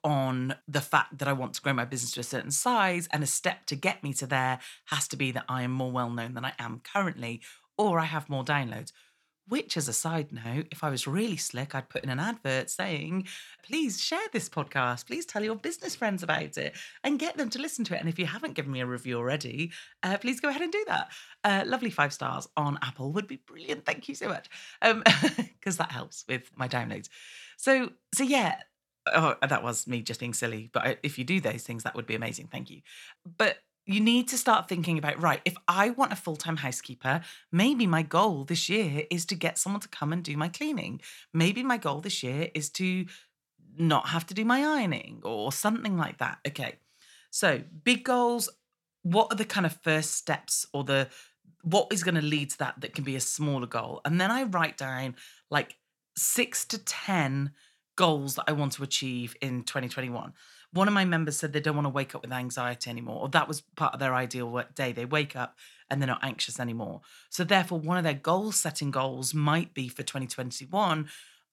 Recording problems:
none

